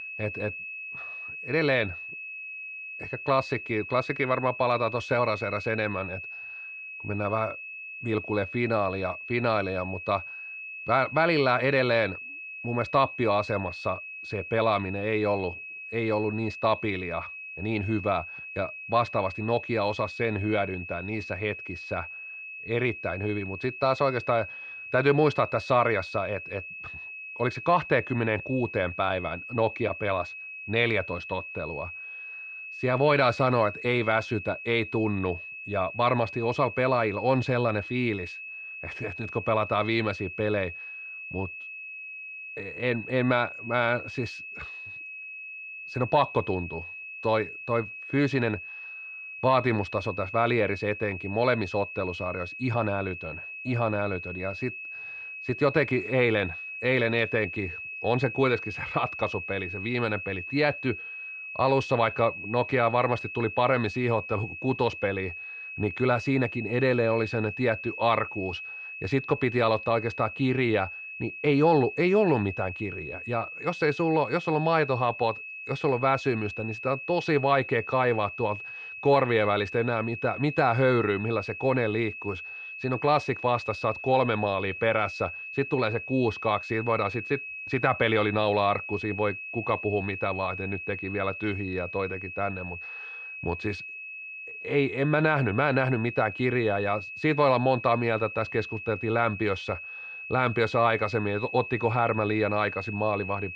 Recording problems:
muffled; very slightly; fading above 3 kHz
high-pitched whine; loud; throughout; 2.5 kHz, 10 dB below the speech

